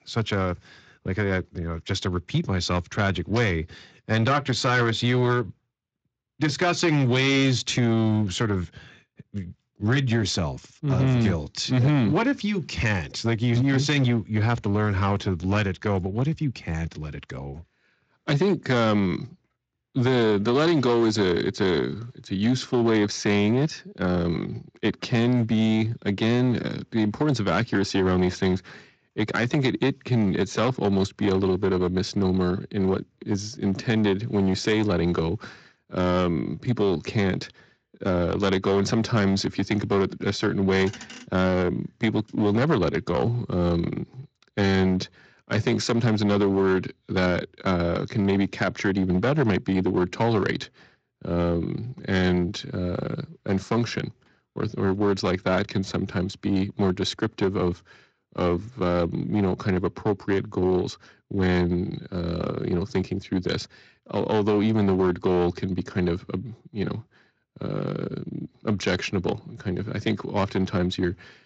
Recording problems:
distortion; slight; 7% of the sound clipped
garbled, watery; slightly; nothing above 7.5 kHz

